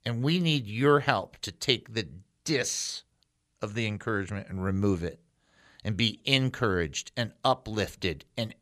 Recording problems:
none

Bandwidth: 14.5 kHz